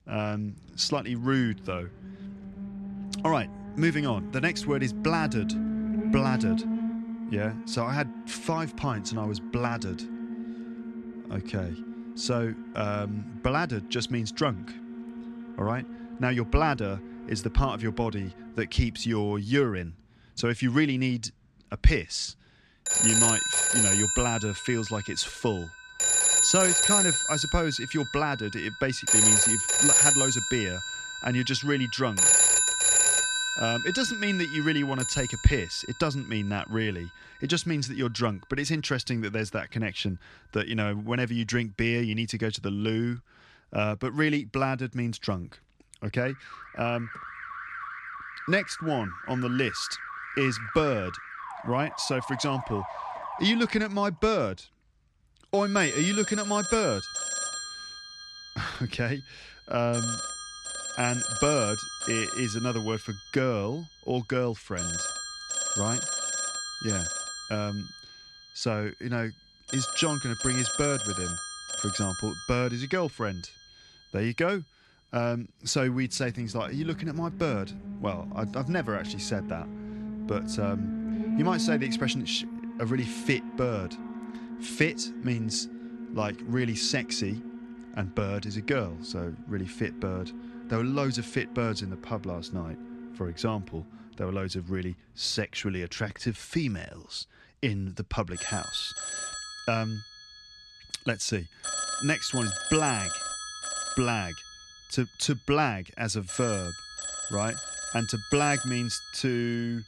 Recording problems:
alarms or sirens; very loud; throughout; 1 dB above the speech

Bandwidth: 13.5 kHz